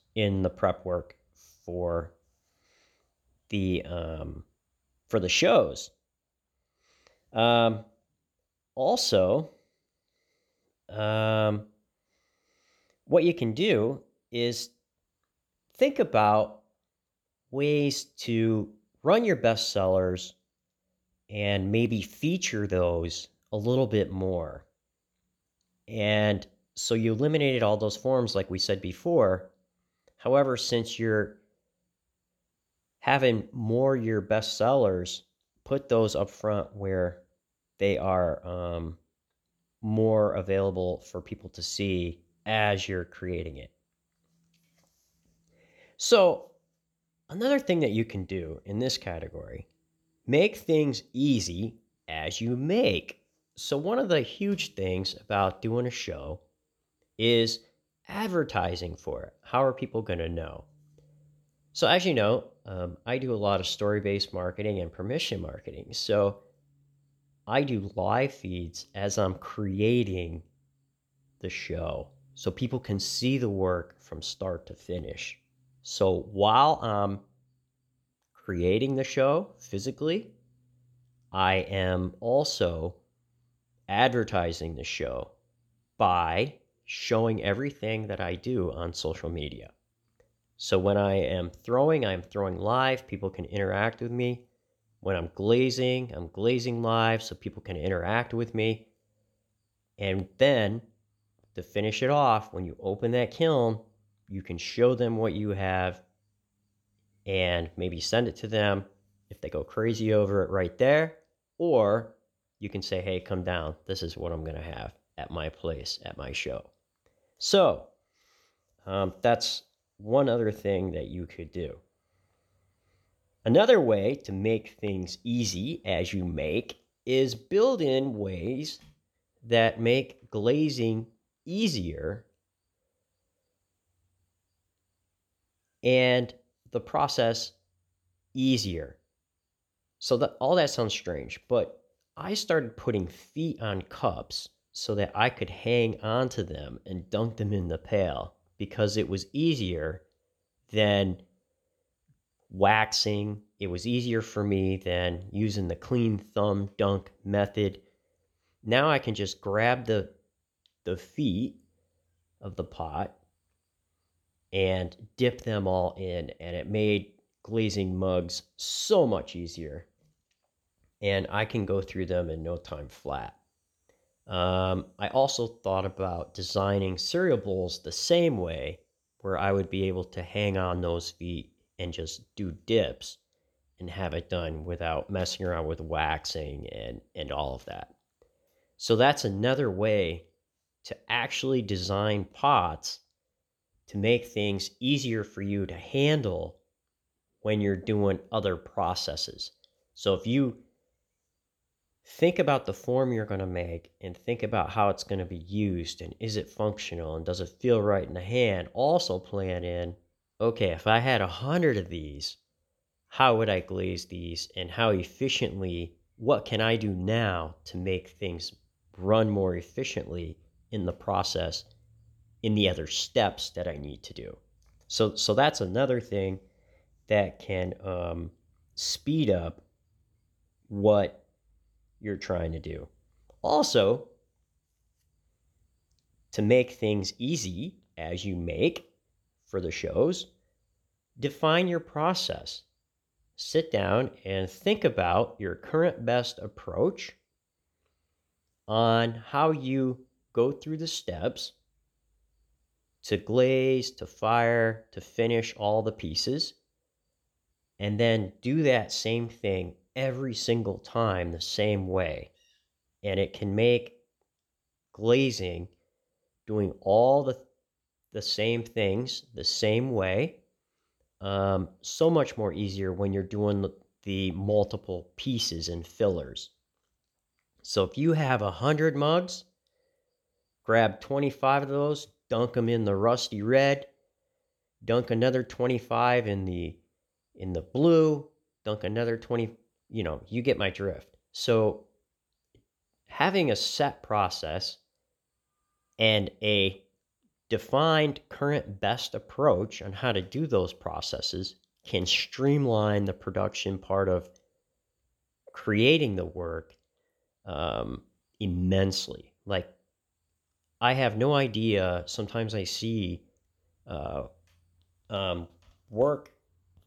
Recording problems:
none

